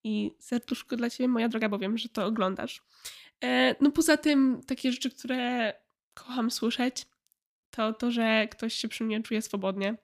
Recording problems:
uneven, jittery; strongly; from 0.5 to 8 s

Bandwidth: 15 kHz